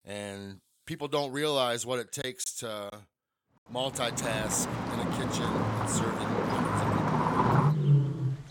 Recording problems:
animal sounds; very loud; from 4.5 s on; 5 dB above the speech
choppy; very; at 2 s; 6% of the speech affected

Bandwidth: 17 kHz